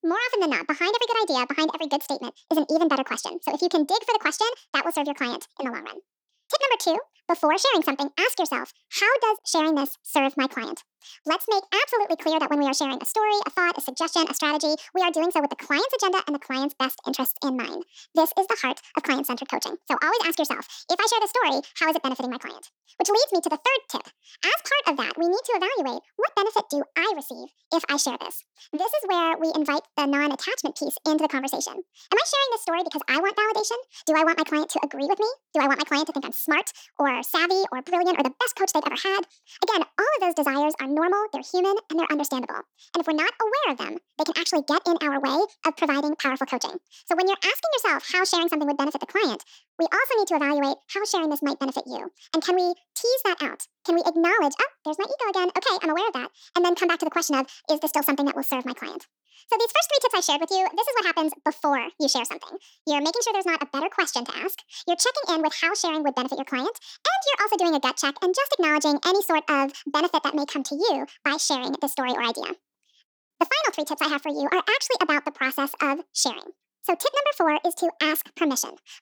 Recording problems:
wrong speed and pitch; too fast and too high; 1.6 times normal speed

